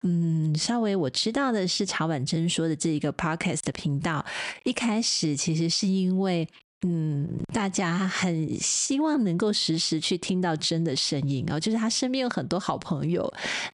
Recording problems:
squashed, flat; heavily

